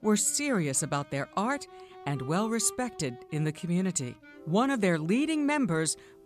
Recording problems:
background music; faint; throughout; 20 dB below the speech

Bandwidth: 14.5 kHz